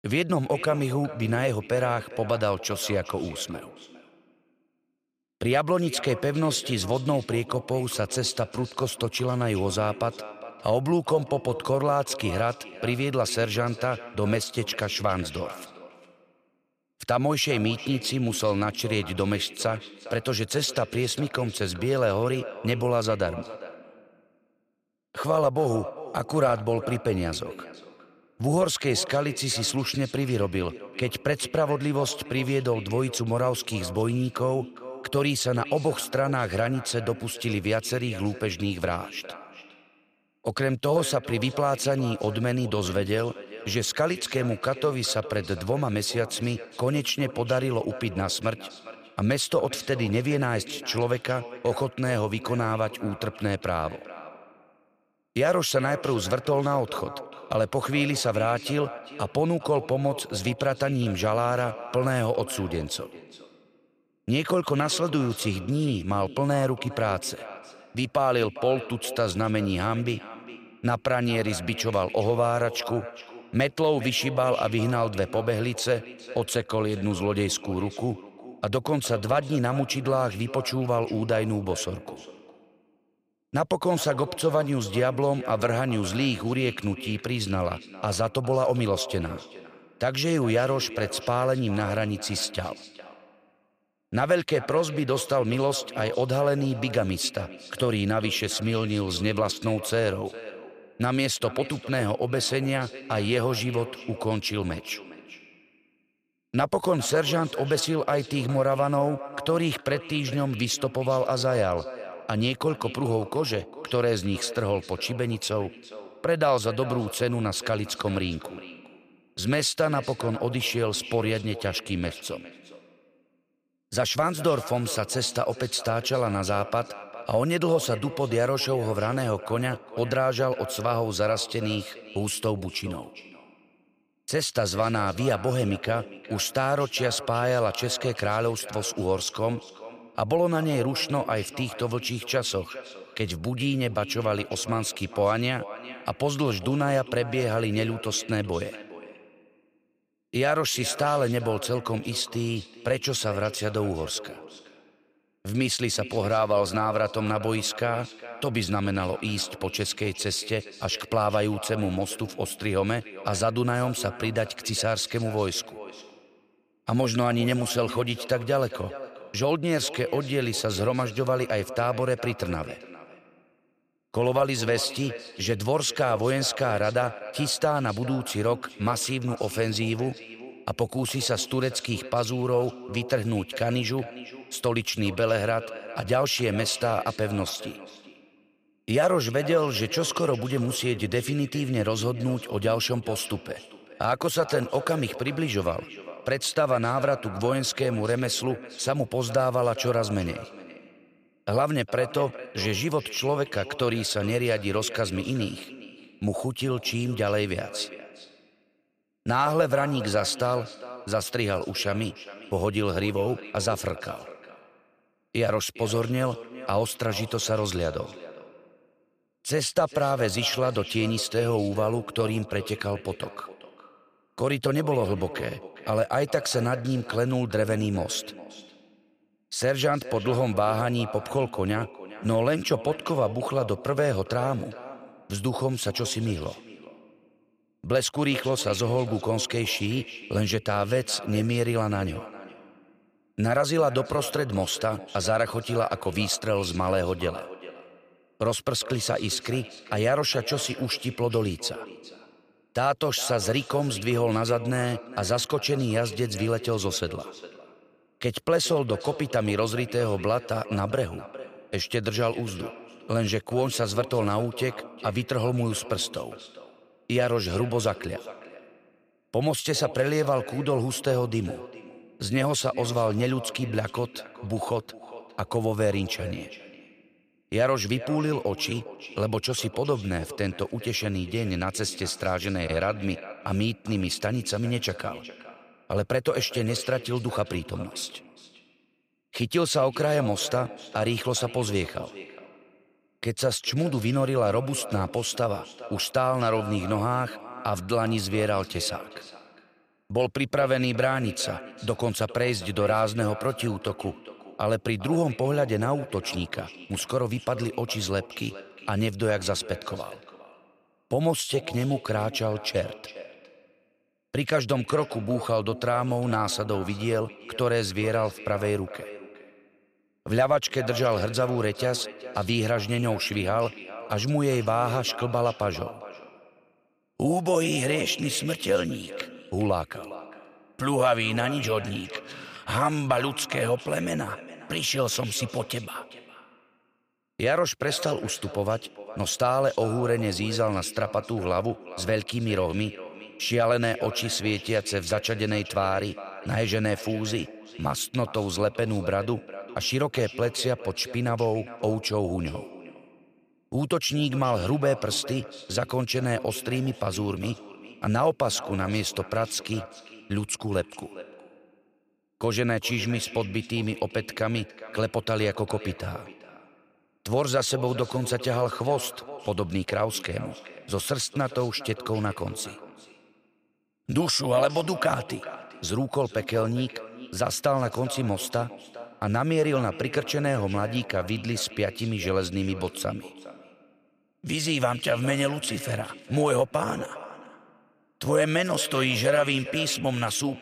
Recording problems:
echo of what is said; noticeable; throughout; 410 ms later, 15 dB below the speech

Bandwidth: 15 kHz